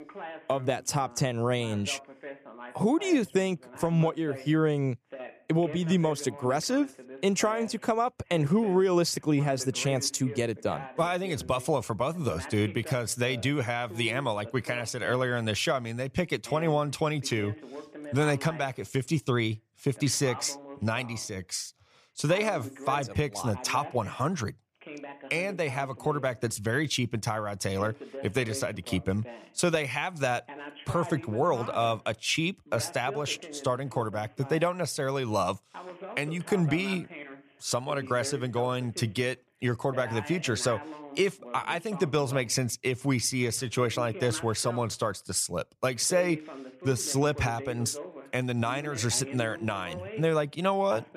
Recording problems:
voice in the background; noticeable; throughout; 15 dB below the speech

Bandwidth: 14.5 kHz